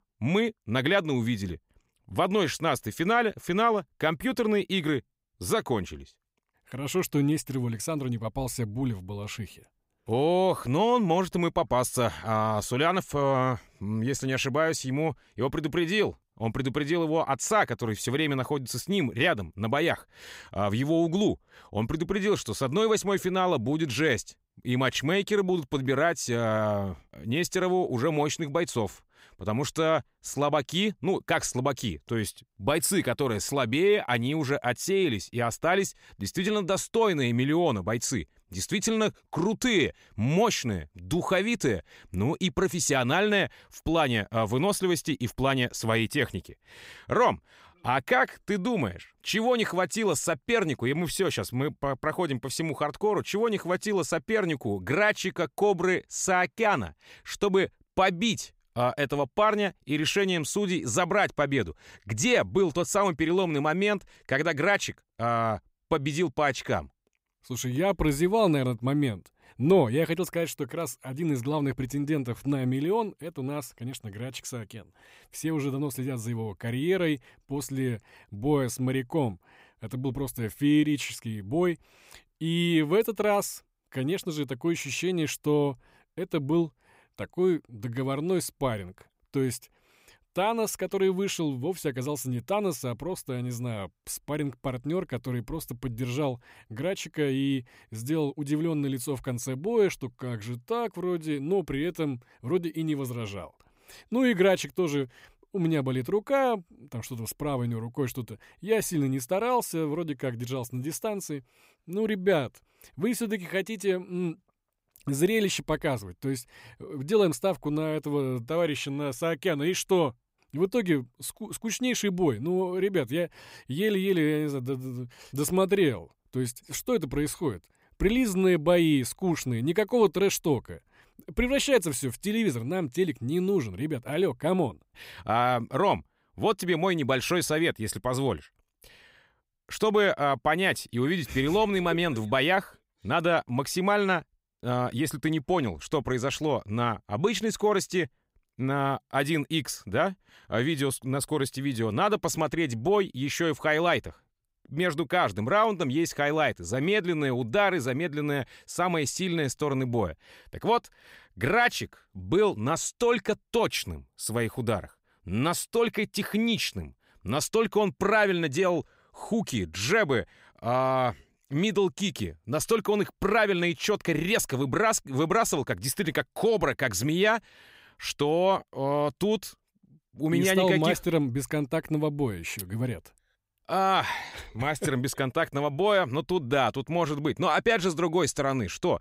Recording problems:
none

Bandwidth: 15.5 kHz